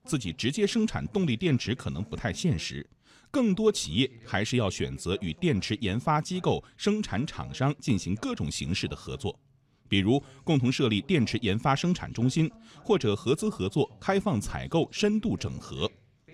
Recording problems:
voice in the background; faint; throughout; 25 dB below the speech

